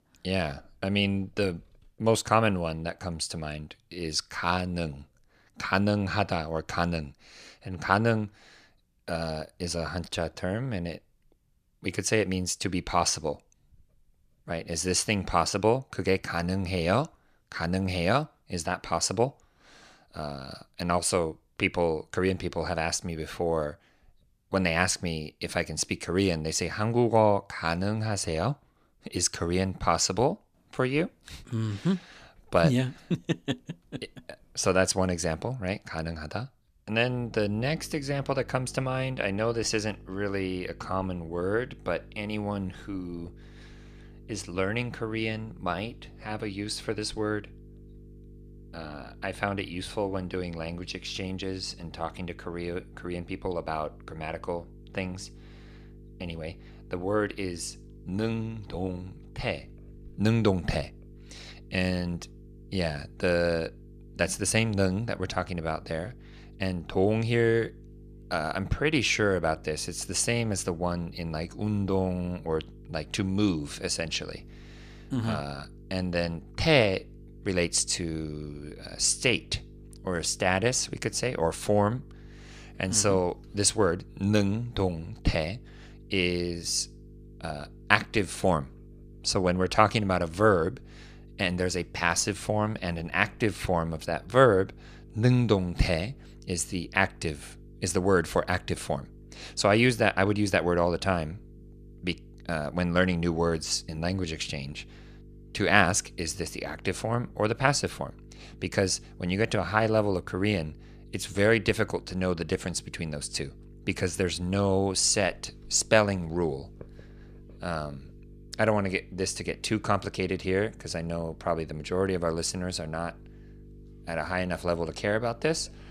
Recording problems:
electrical hum; faint; from 37 s on; 50 Hz, 30 dB below the speech

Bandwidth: 14.5 kHz